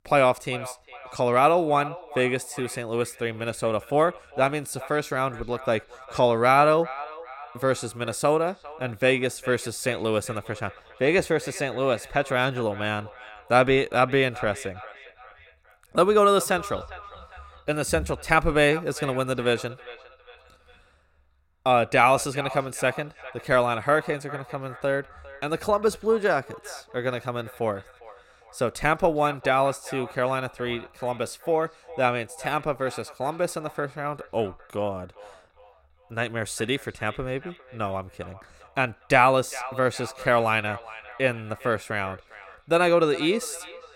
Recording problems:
echo of what is said; noticeable; throughout; 400 ms later, 20 dB below the speech

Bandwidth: 16.5 kHz